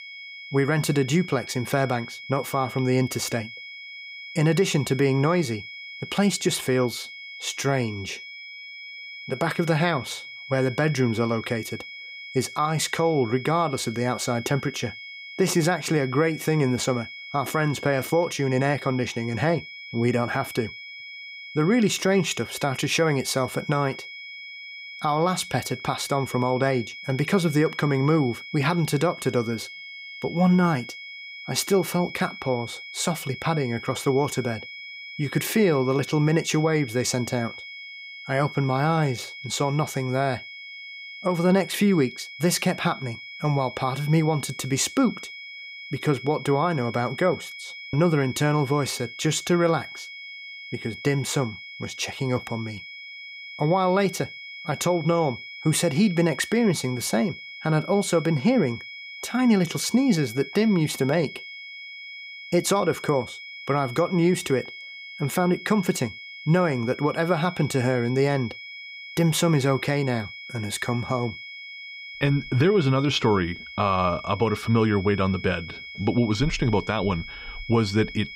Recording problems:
high-pitched whine; noticeable; throughout; 2 kHz, 15 dB below the speech

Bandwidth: 15.5 kHz